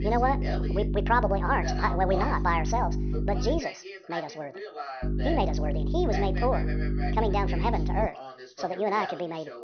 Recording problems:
wrong speed and pitch; too fast and too high; 1.6 times normal speed
high frequencies cut off; noticeable; nothing above 6 kHz
electrical hum; noticeable; until 3.5 s and from 5 to 8 s; 50 Hz, 10 dB below the speech
voice in the background; noticeable; throughout; 10 dB below the speech

